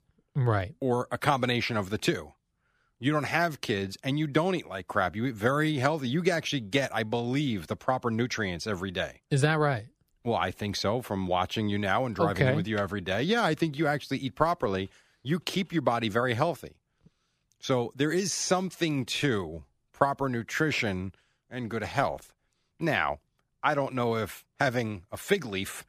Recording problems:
none

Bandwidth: 15 kHz